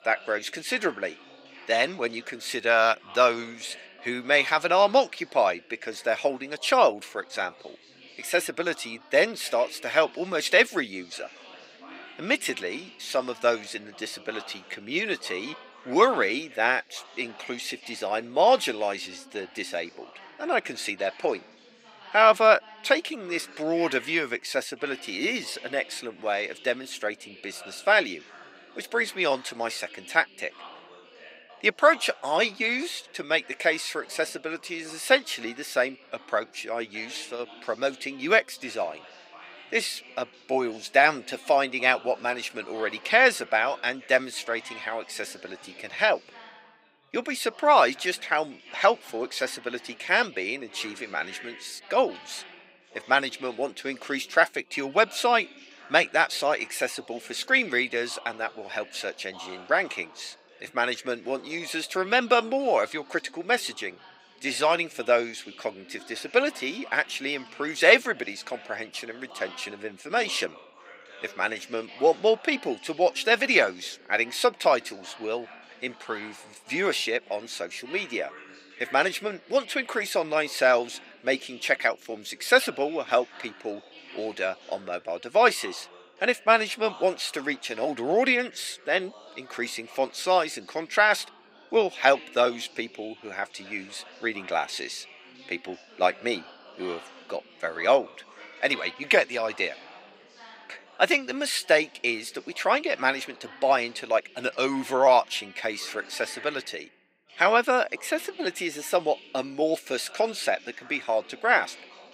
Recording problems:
thin; somewhat; fading below 500 Hz
background chatter; faint; throughout; 3 voices, 20 dB below the speech

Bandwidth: 15.5 kHz